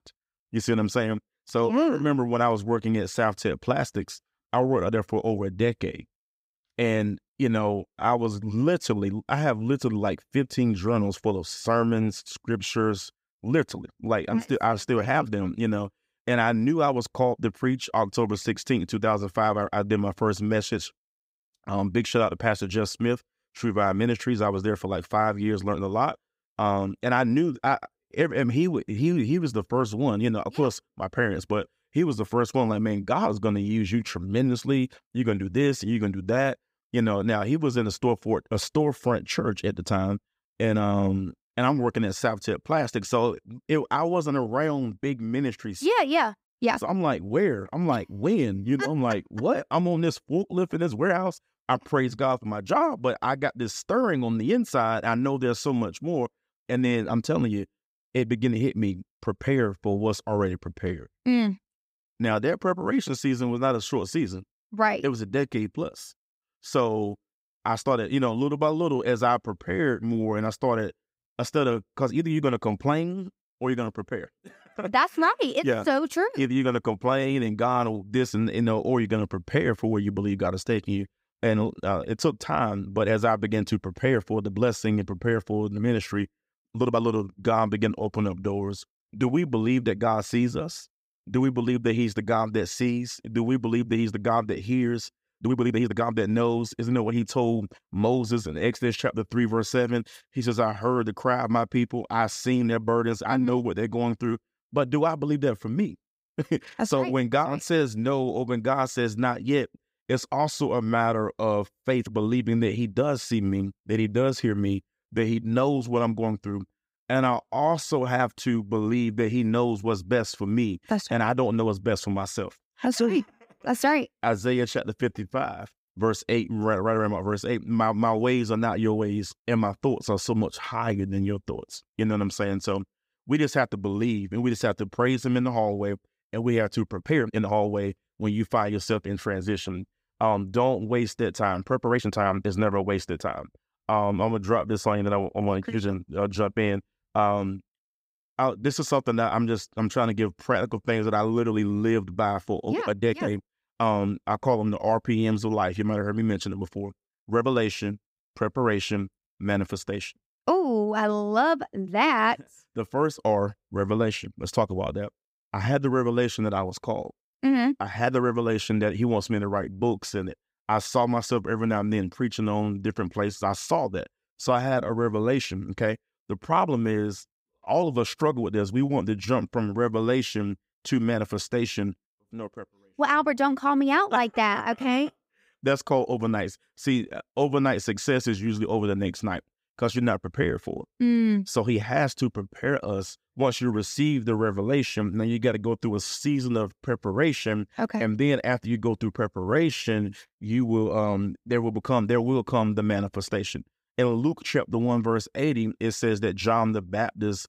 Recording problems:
uneven, jittery; strongly; from 46 s to 3:20

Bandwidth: 15.5 kHz